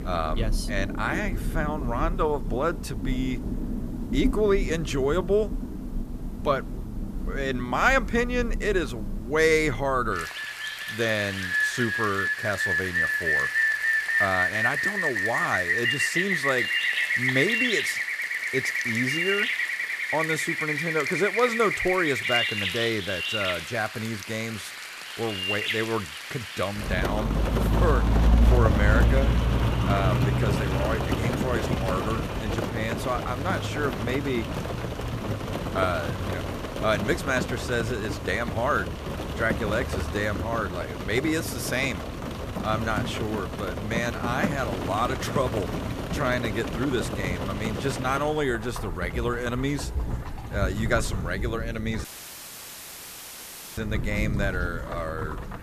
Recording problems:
rain or running water; very loud; throughout; as loud as the speech
audio cutting out; at 52 s for 1.5 s

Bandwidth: 14.5 kHz